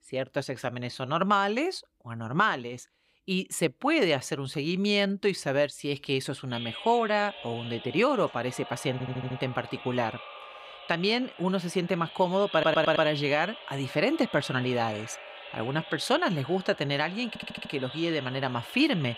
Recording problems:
echo of what is said; noticeable; from 6.5 s on; 460 ms later, 15 dB below the speech
audio stuttering; at 9 s, at 13 s and at 17 s

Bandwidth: 15.5 kHz